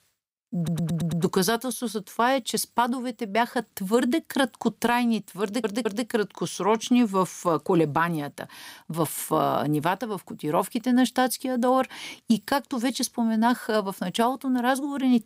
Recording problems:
audio stuttering; at 0.5 s and at 5.5 s

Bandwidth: 15.5 kHz